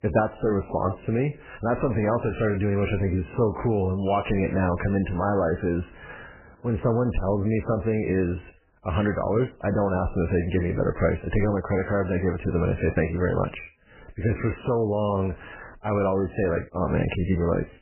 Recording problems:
garbled, watery; badly; nothing above 3 kHz

